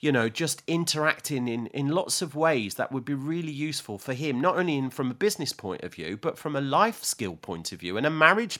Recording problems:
none

